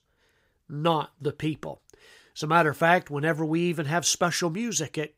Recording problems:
none

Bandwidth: 15.5 kHz